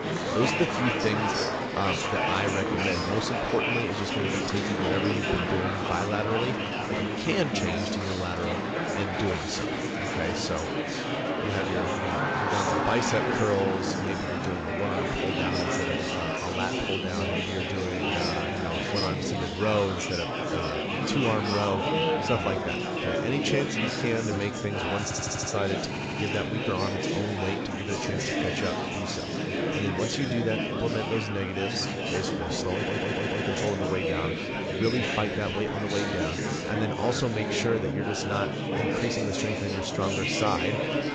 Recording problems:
garbled, watery; slightly
murmuring crowd; very loud; throughout; 2 dB above the speech
audio stuttering; at 25 s, at 26 s and at 33 s

